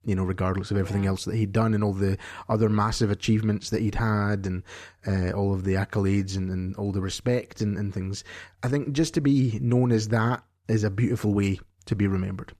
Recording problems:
none

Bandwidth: 14.5 kHz